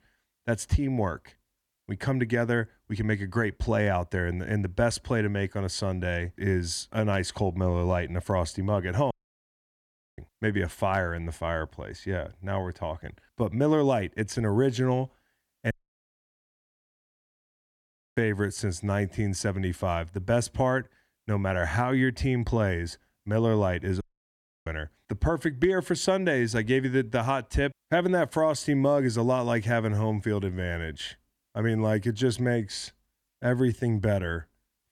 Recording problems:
audio cutting out; at 9 s for 1 s, at 16 s for 2.5 s and at 24 s for 0.5 s

